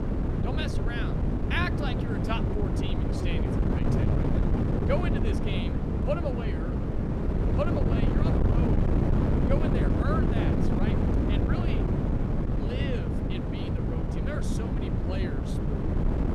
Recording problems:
wind noise on the microphone; heavy; 2 dB above the speech

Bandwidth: 15 kHz